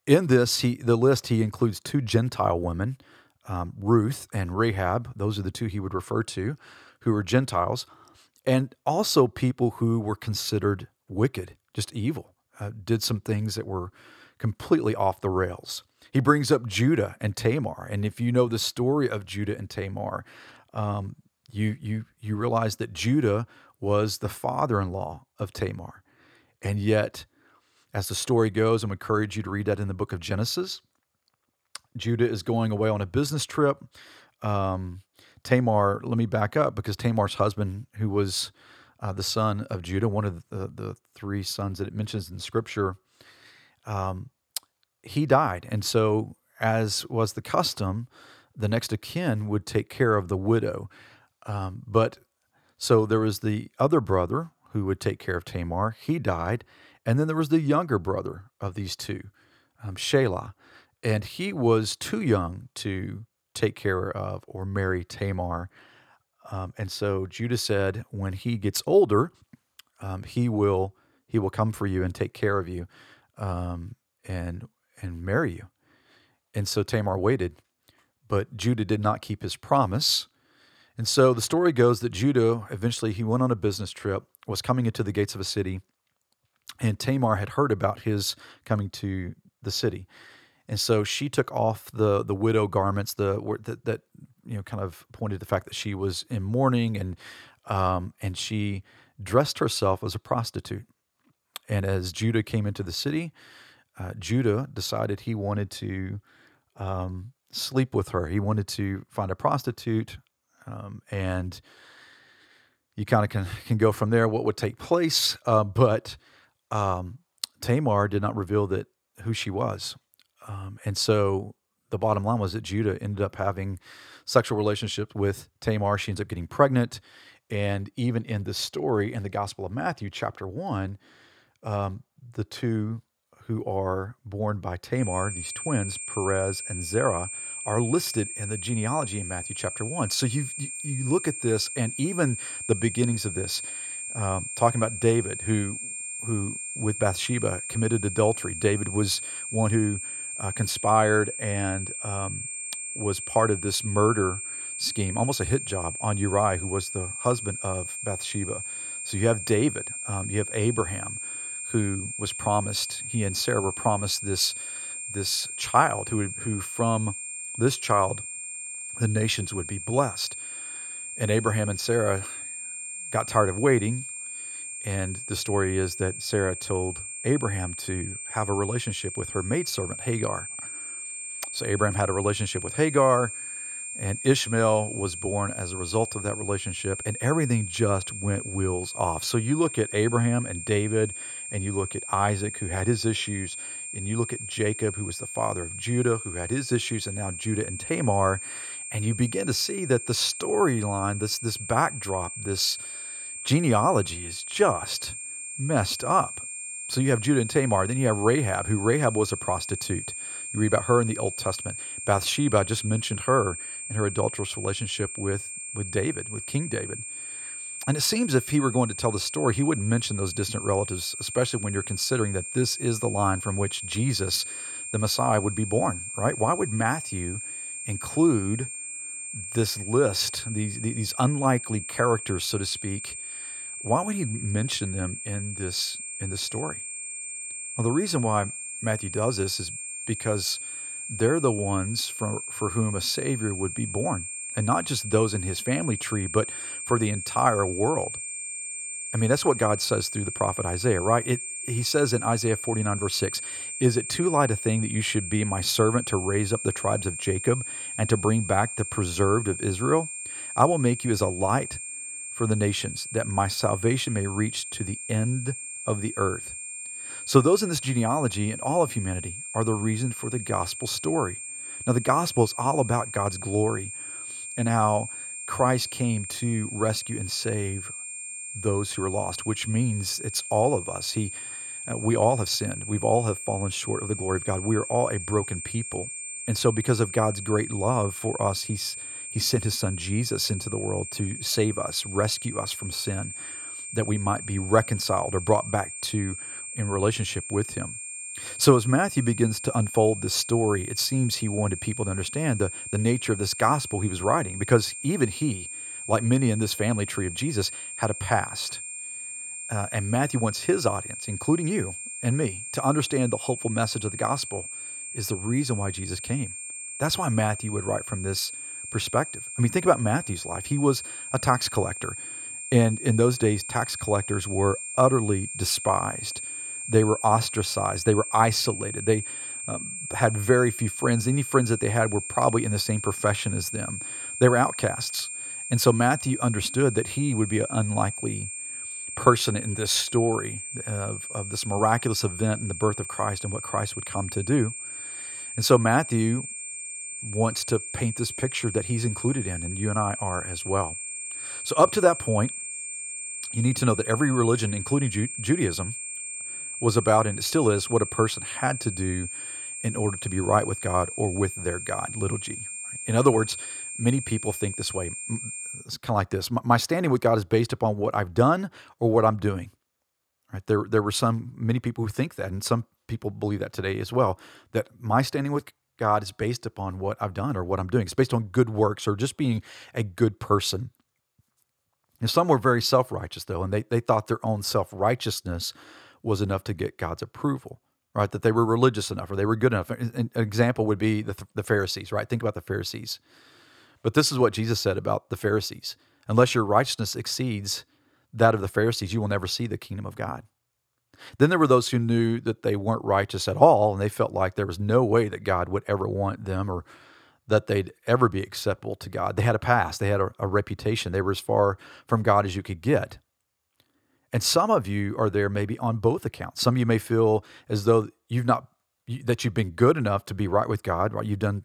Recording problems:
high-pitched whine; loud; from 2:15 to 6:06; 8.5 kHz, 7 dB below the speech

